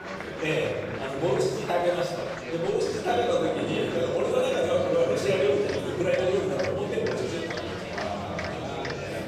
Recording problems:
off-mic speech; far
room echo; noticeable; dies away in 1.2 s
murmuring crowd; loud; throughout; 7 dB below the speech

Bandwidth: 15 kHz